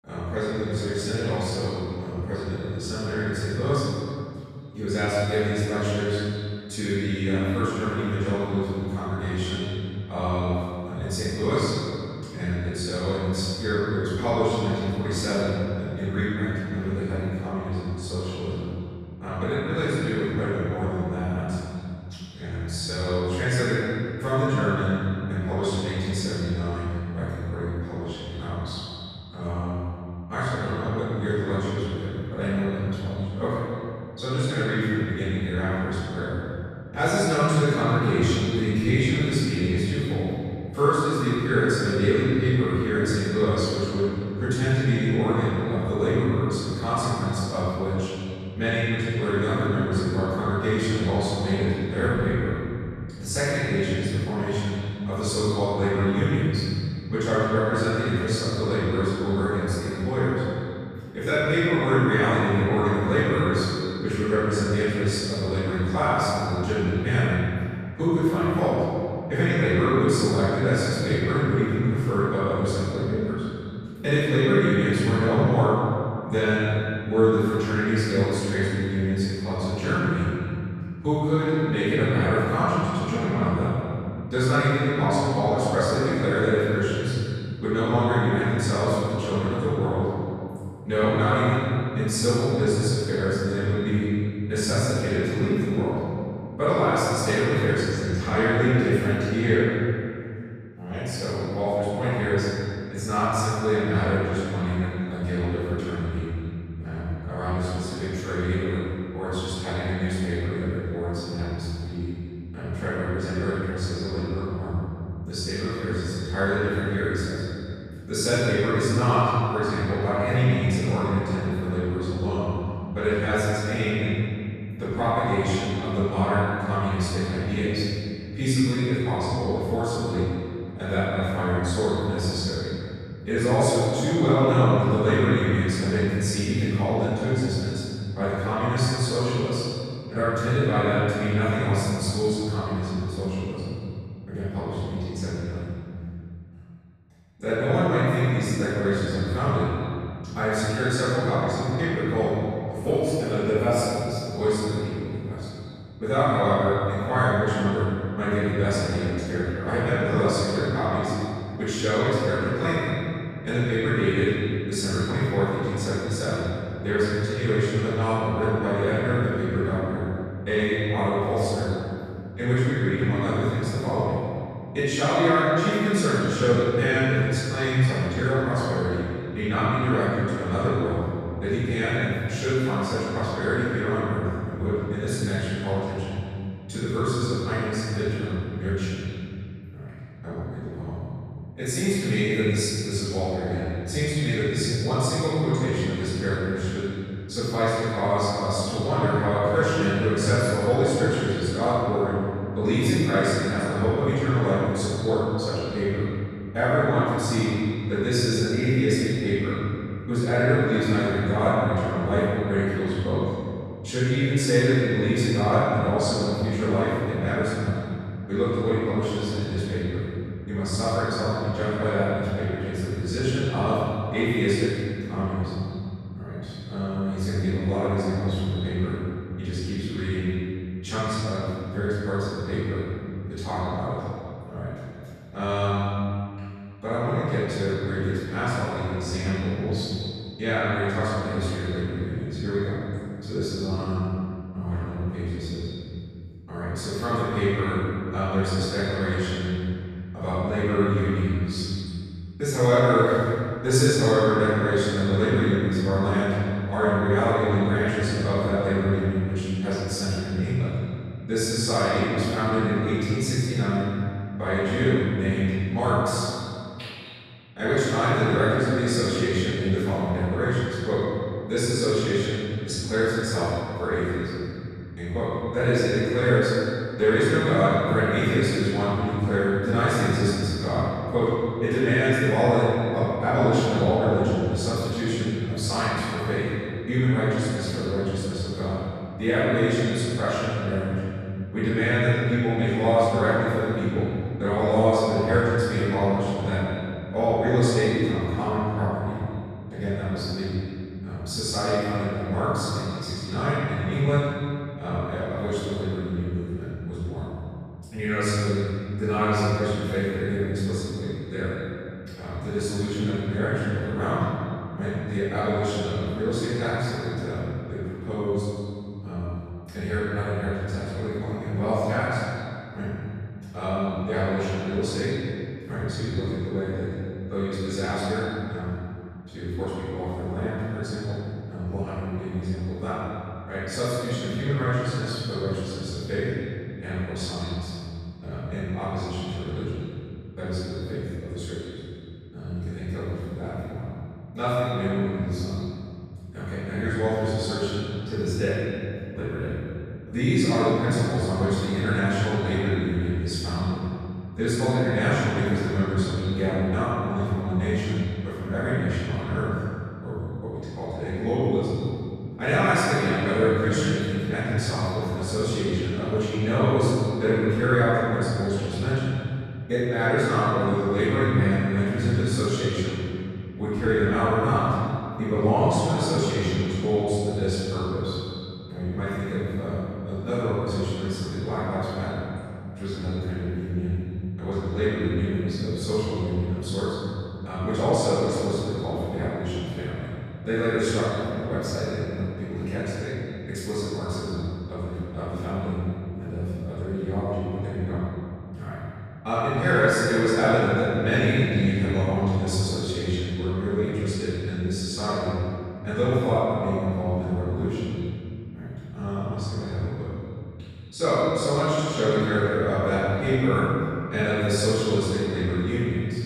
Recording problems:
room echo; strong; dies away in 2.5 s
off-mic speech; far
echo of what is said; faint; throughout; 90 ms later, 20 dB below the speech

